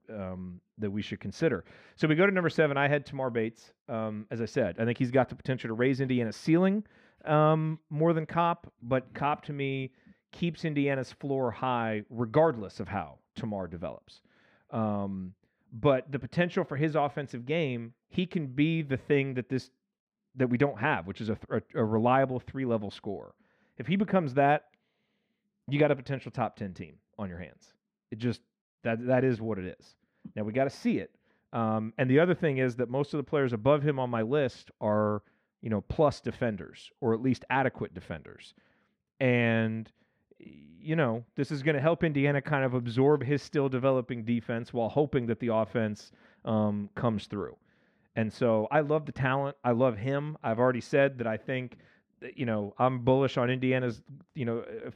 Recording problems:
muffled; very; fading above 3.5 kHz

